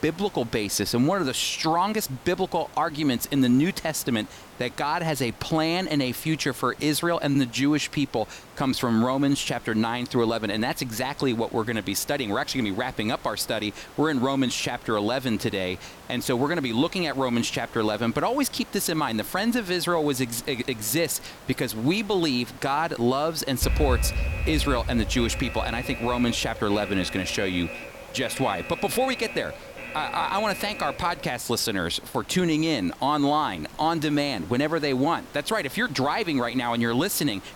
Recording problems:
hiss; faint; throughout; 20 dB below the speech
alarm; noticeable; from 24 to 31 s; peak level with the speech

